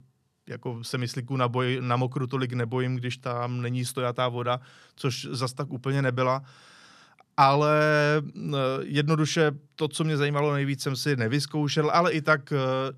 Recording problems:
none

